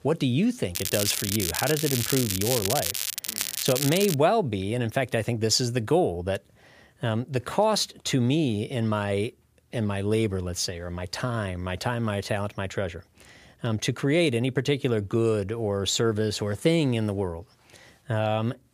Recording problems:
crackling; loud; from 1 to 4 s; 2 dB below the speech

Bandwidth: 15 kHz